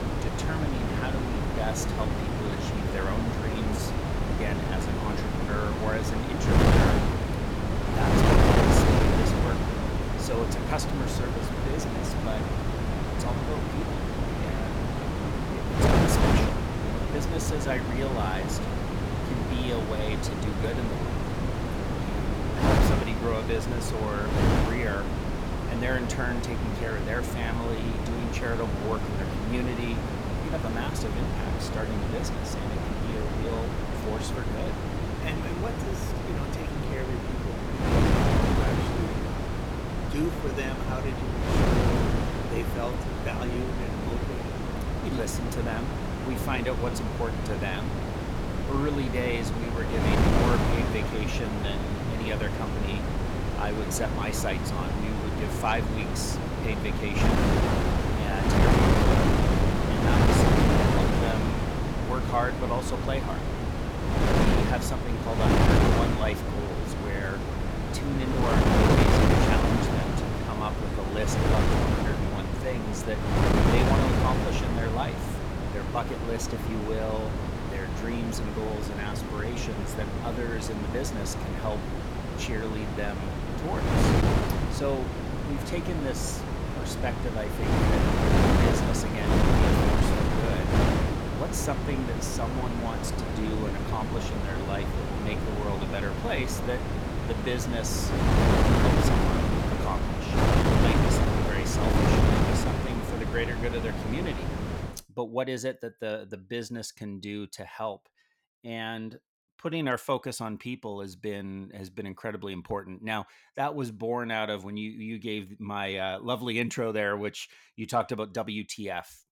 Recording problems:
wind noise on the microphone; heavy; until 1:45; 3 dB above the speech

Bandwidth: 17 kHz